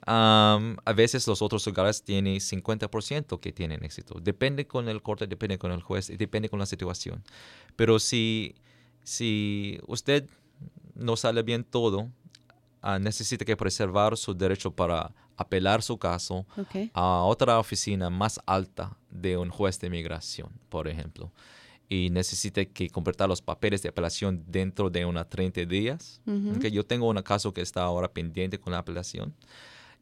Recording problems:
none

